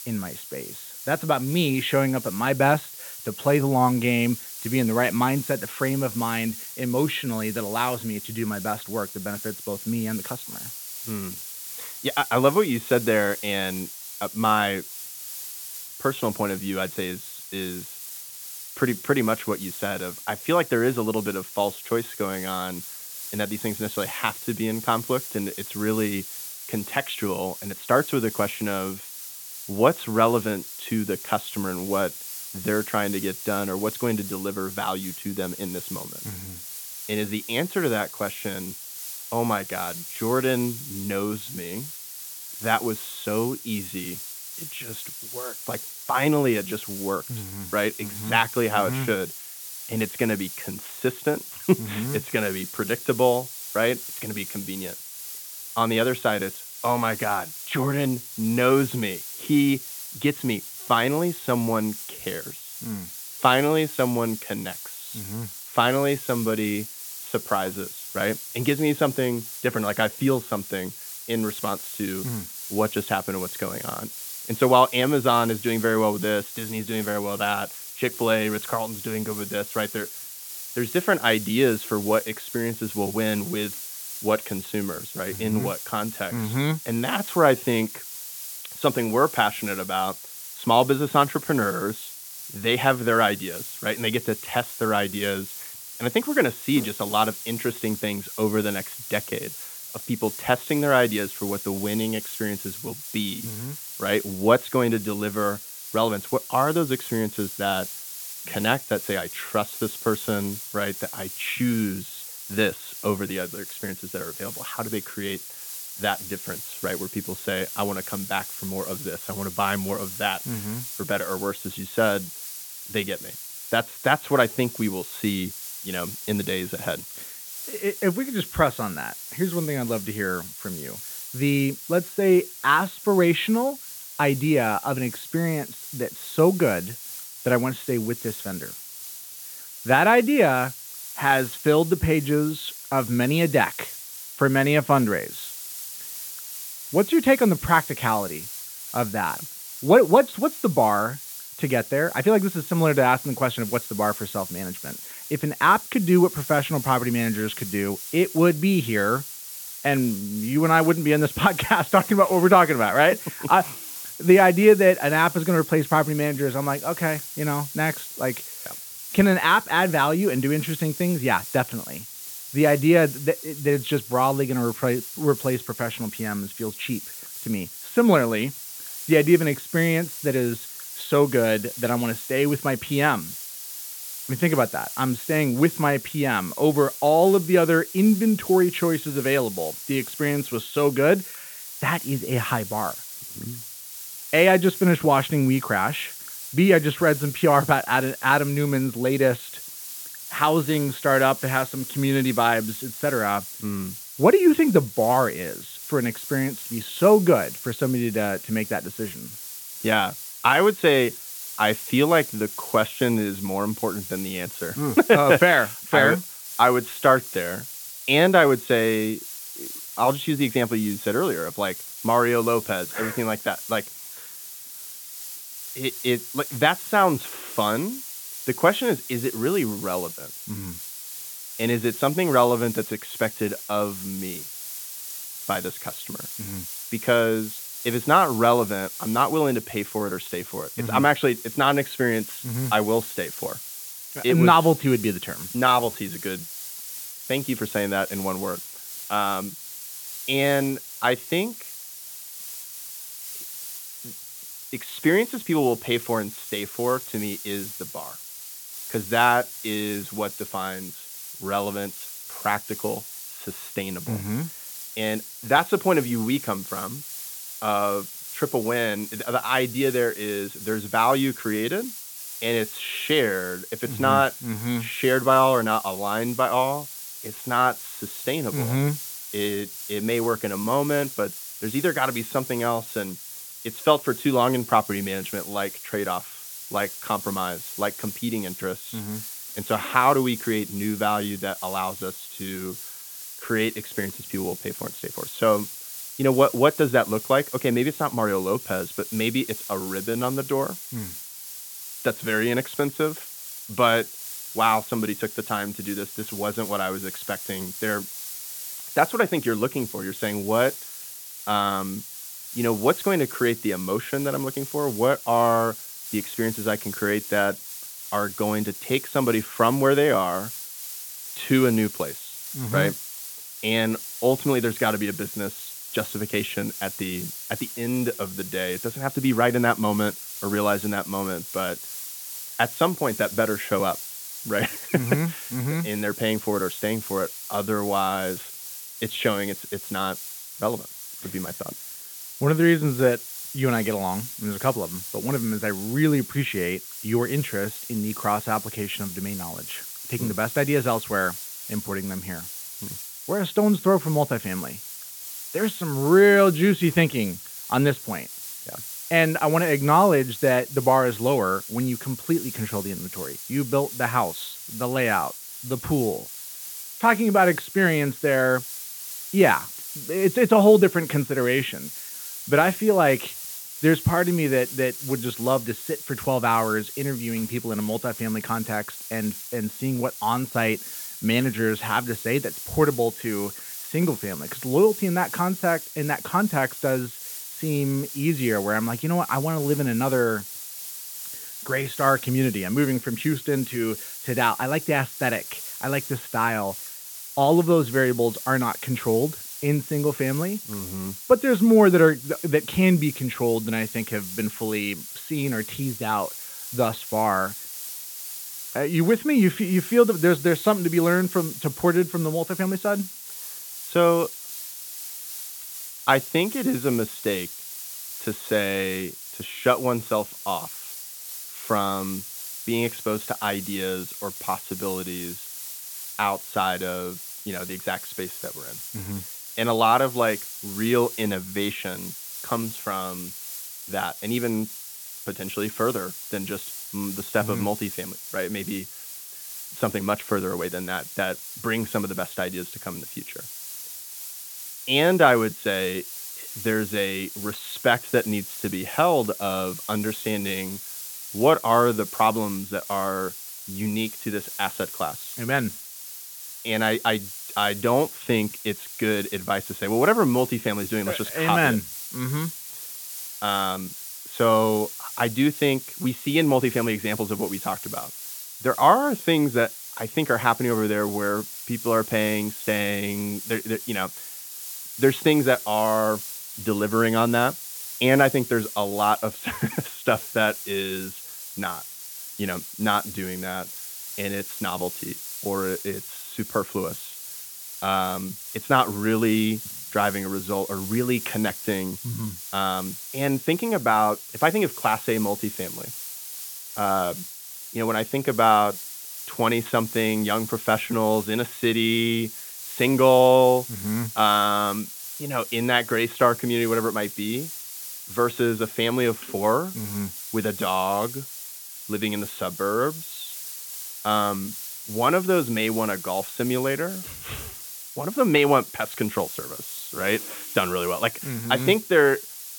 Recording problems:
high frequencies cut off; severe; nothing above 4 kHz
hiss; noticeable; throughout; 10 dB below the speech

